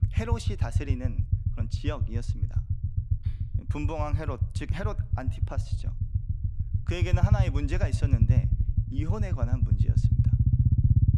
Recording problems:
low rumble; loud; throughout; 4 dB below the speech

